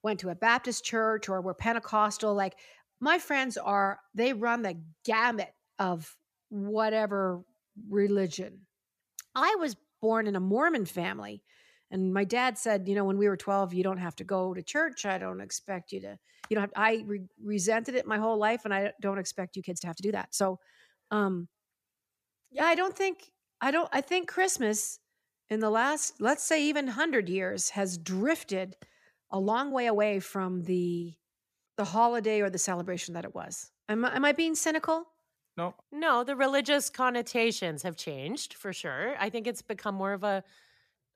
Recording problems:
uneven, jittery; strongly; from 3.5 to 34 s

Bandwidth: 14.5 kHz